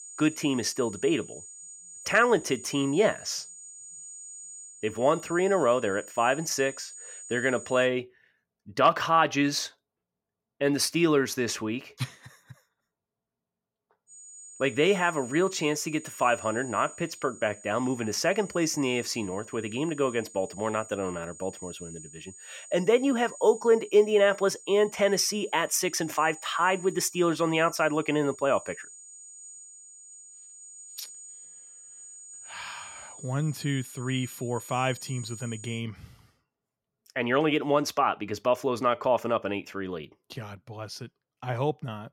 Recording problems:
high-pitched whine; noticeable; until 8 s and from 14 to 36 s; 7 kHz, 15 dB below the speech

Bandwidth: 16.5 kHz